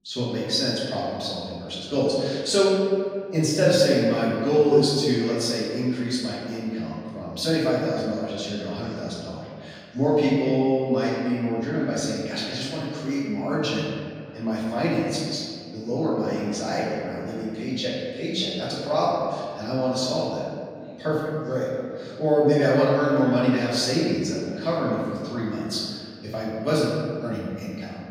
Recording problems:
room echo; strong; dies away in 1.9 s
off-mic speech; far
voice in the background; faint; throughout; 25 dB below the speech

